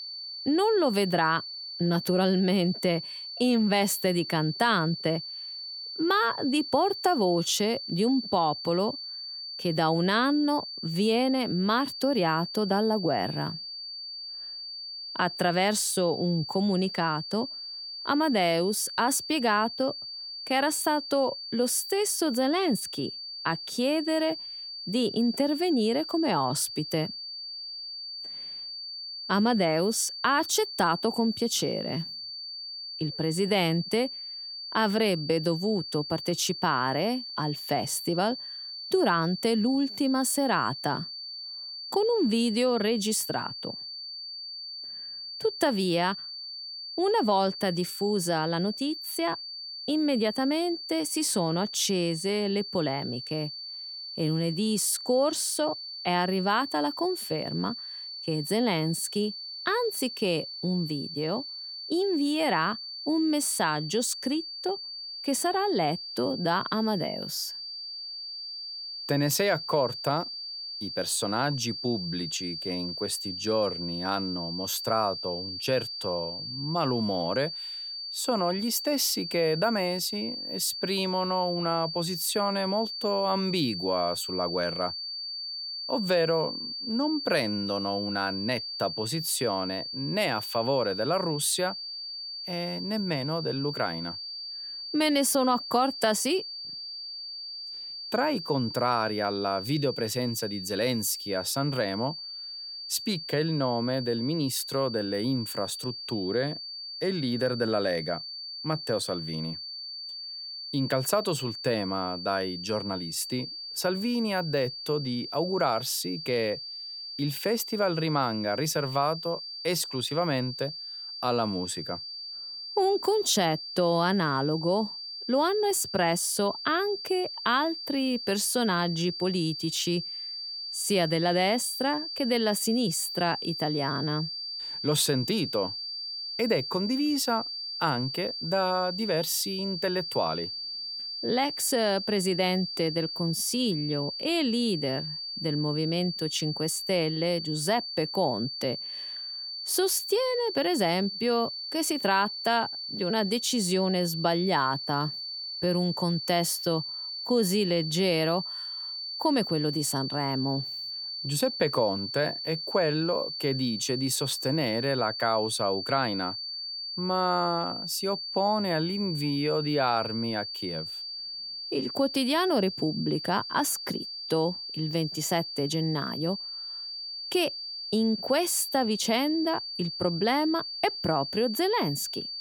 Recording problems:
high-pitched whine; loud; throughout; 4.5 kHz, 7 dB below the speech

